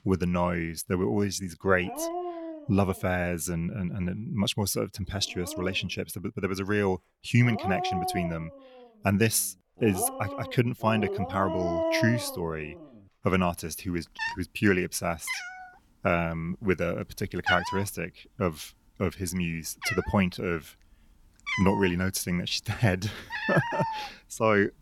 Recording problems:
animal sounds; loud; throughout; 5 dB below the speech

